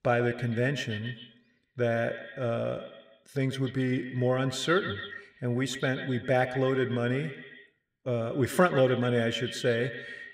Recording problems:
echo of what is said; strong; throughout; 130 ms later, 10 dB below the speech

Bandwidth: 15.5 kHz